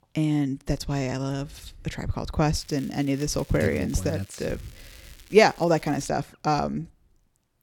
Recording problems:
crackling; faint; from 2.5 to 6 s; 25 dB below the speech

